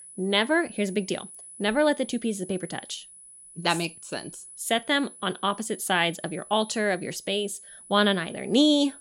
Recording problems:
high-pitched whine; noticeable; throughout; 10 kHz, 15 dB below the speech

